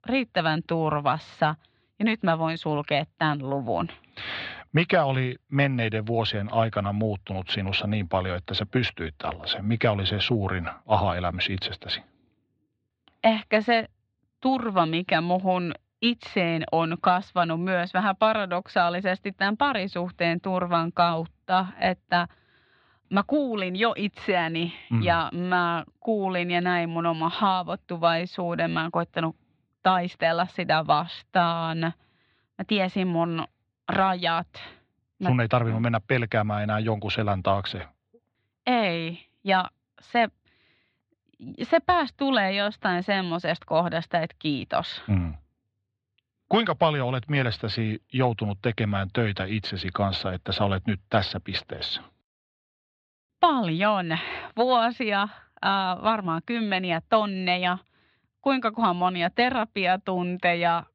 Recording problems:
muffled; slightly; fading above 4 kHz

